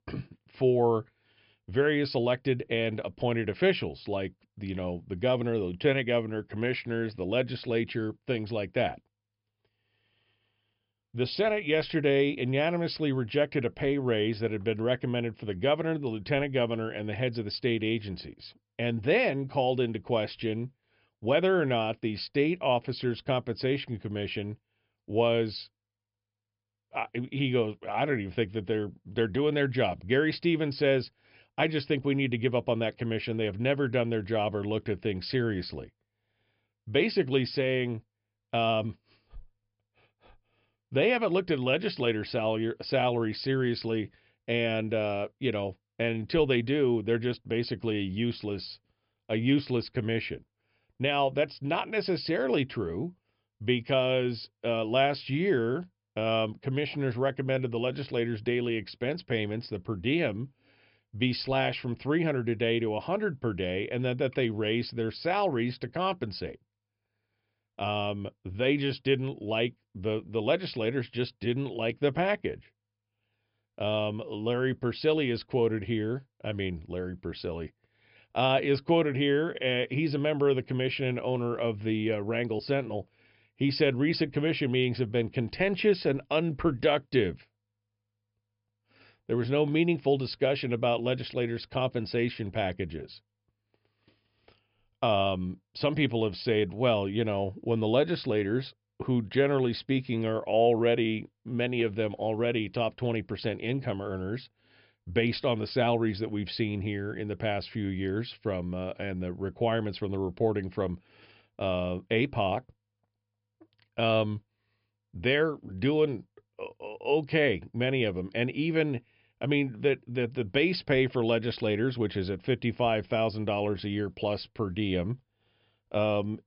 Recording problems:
high frequencies cut off; noticeable; nothing above 5.5 kHz

